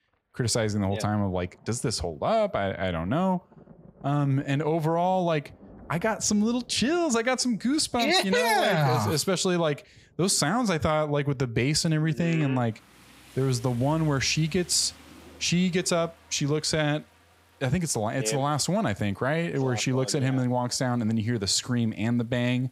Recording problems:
rain or running water; faint; throughout; 30 dB below the speech

